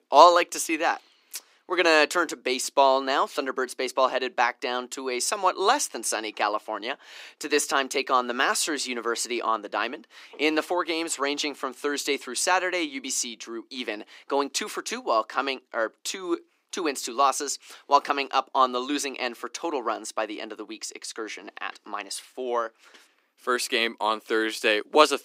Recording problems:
thin; somewhat; fading below 300 Hz

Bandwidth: 15.5 kHz